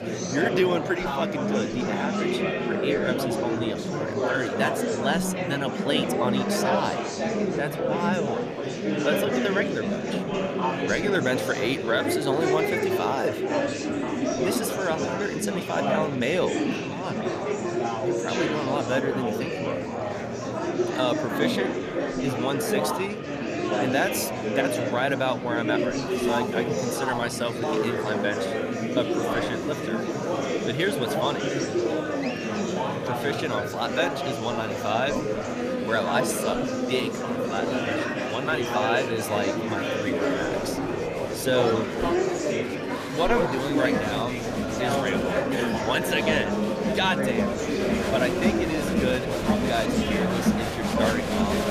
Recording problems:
murmuring crowd; very loud; throughout; 2 dB above the speech
alarms or sirens; noticeable; throughout; 15 dB below the speech

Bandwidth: 14.5 kHz